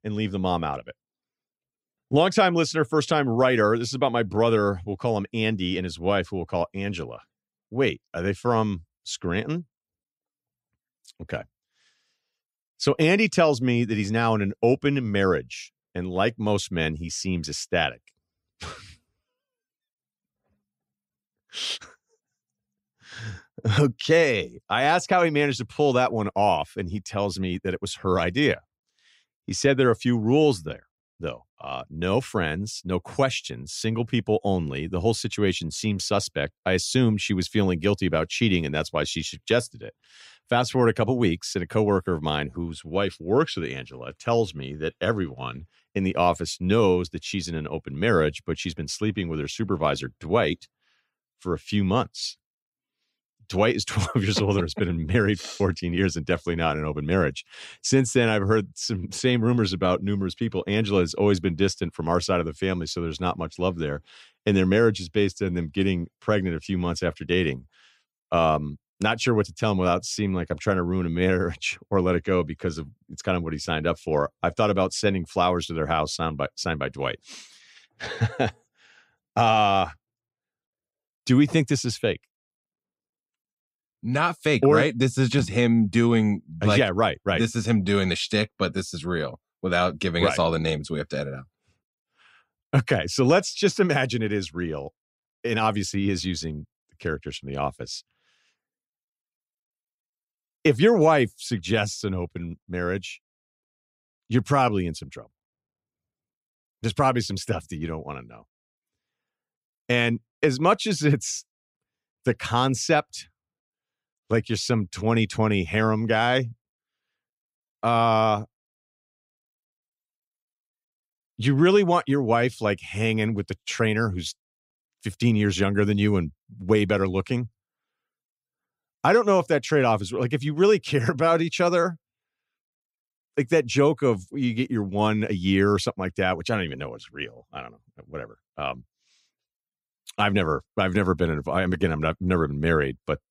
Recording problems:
none

